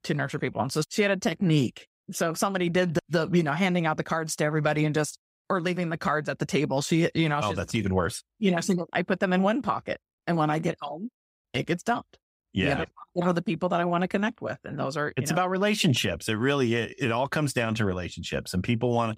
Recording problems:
none

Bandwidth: 15.5 kHz